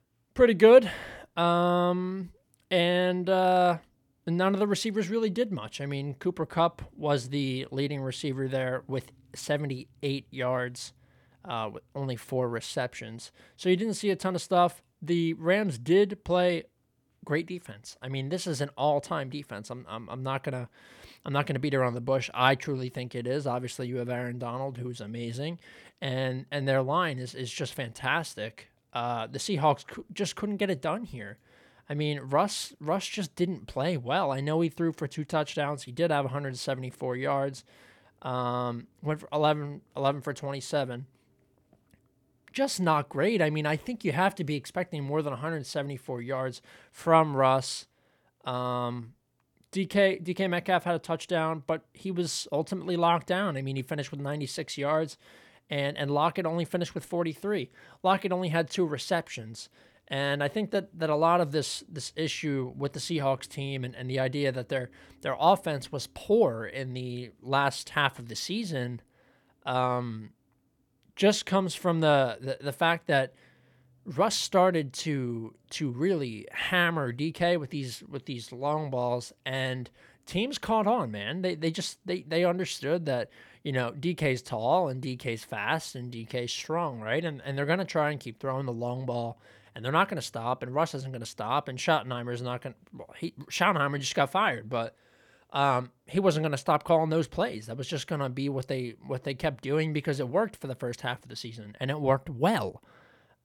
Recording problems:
none

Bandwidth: 18.5 kHz